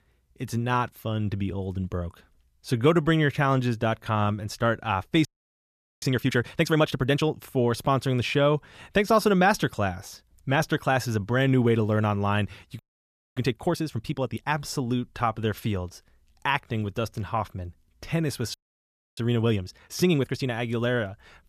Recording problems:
audio freezing; at 5.5 s for 1 s, at 13 s for 0.5 s and at 19 s for 0.5 s

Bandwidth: 14.5 kHz